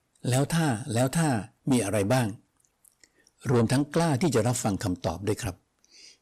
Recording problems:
distortion; slight; 10 dB below the speech

